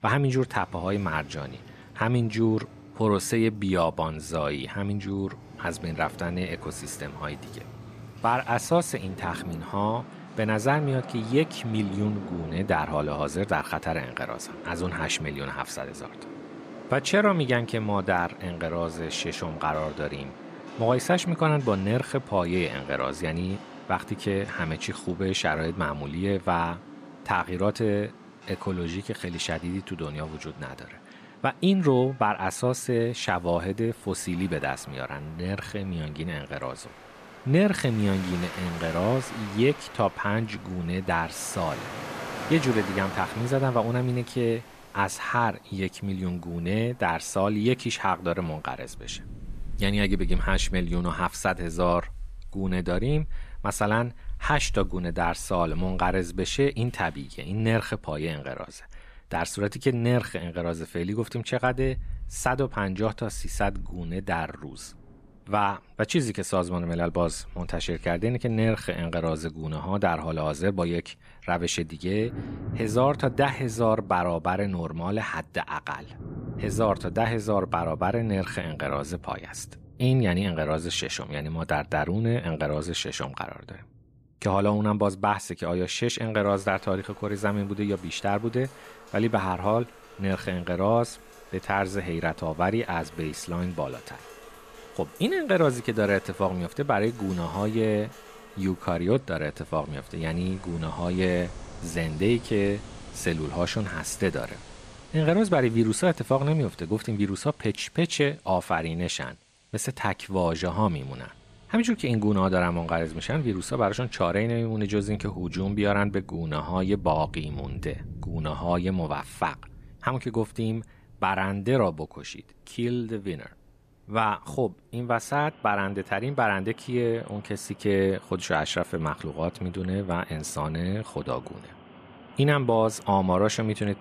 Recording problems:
rain or running water; noticeable; throughout; 15 dB below the speech

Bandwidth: 14.5 kHz